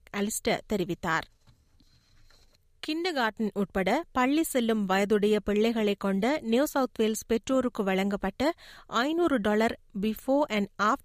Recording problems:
none

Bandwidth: 15 kHz